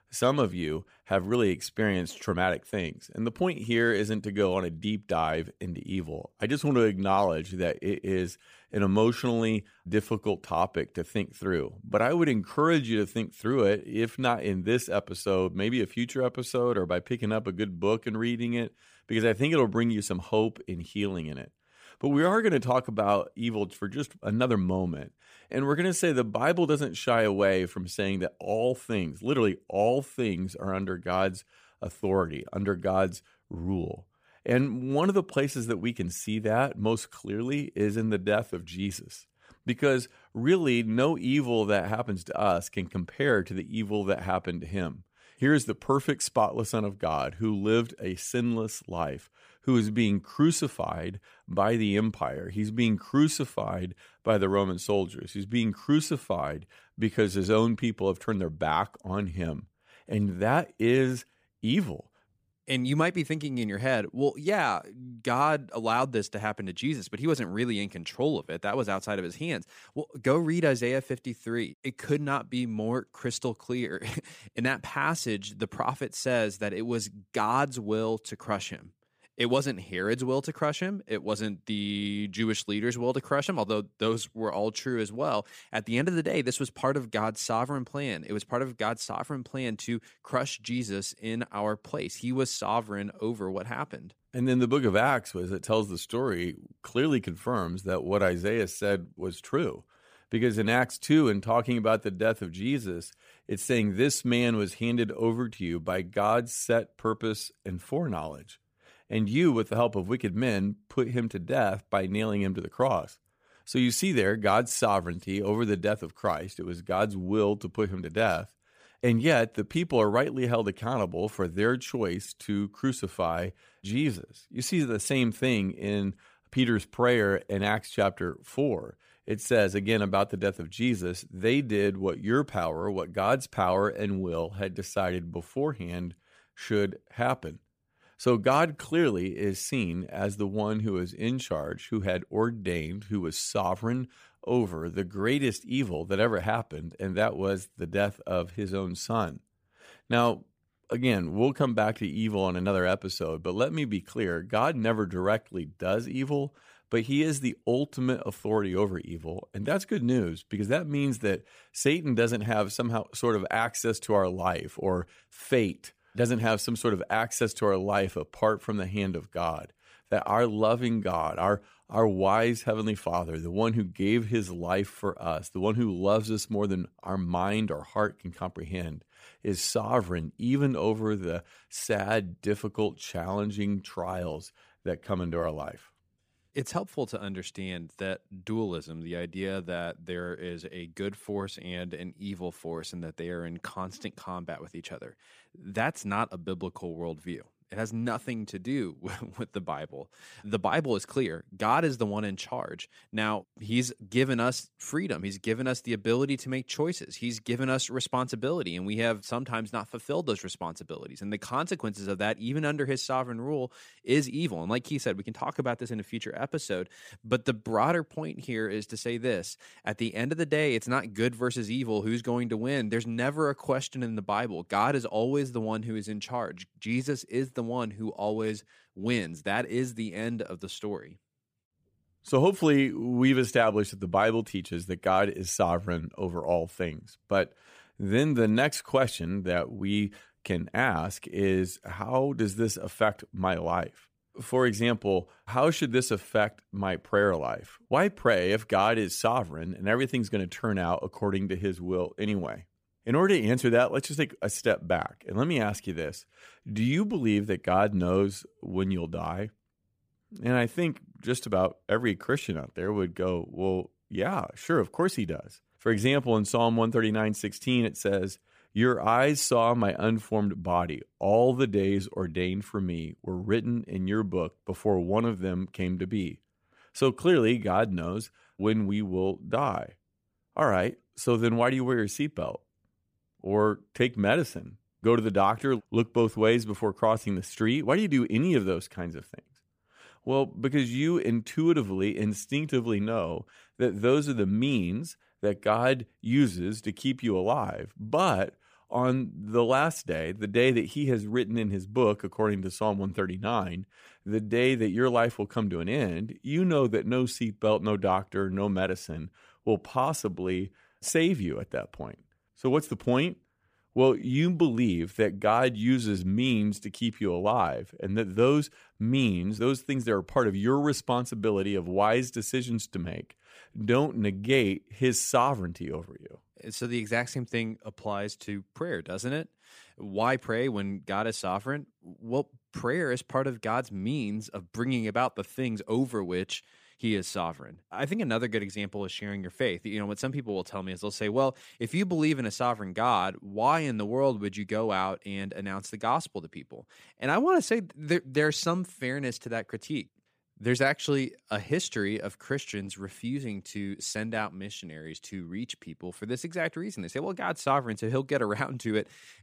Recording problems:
none

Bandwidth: 15 kHz